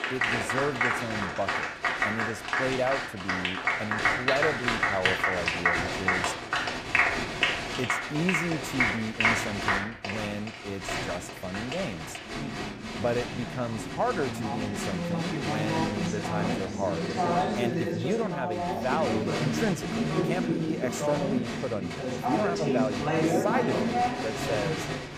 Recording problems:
crowd noise; very loud; throughout; 5 dB above the speech

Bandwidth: 14.5 kHz